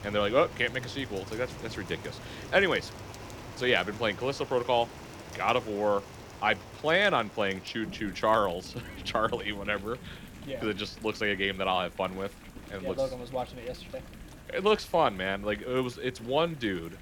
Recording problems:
rain or running water; noticeable; throughout; 15 dB below the speech

